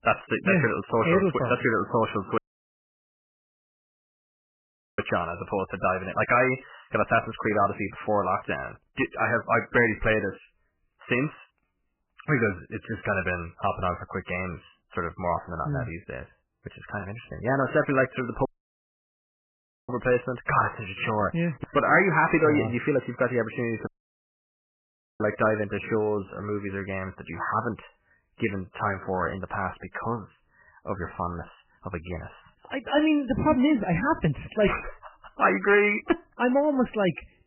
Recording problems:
garbled, watery; badly; nothing above 3 kHz
distortion; slight; 10 dB below the speech
audio cutting out; at 2.5 s for 2.5 s, at 18 s for 1.5 s and at 24 s for 1.5 s

